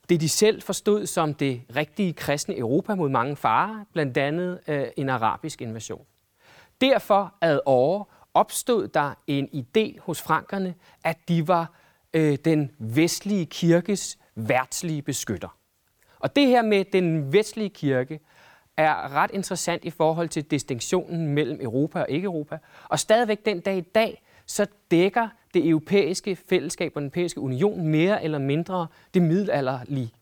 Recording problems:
none

